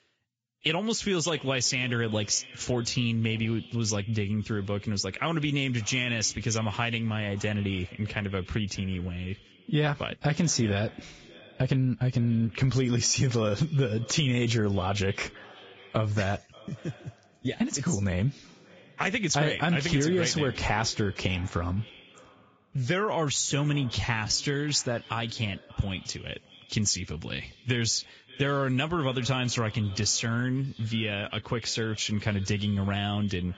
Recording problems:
garbled, watery; badly; nothing above 7.5 kHz
echo of what is said; faint; throughout; 580 ms later, 20 dB below the speech
uneven, jittery; strongly; from 11 to 29 s

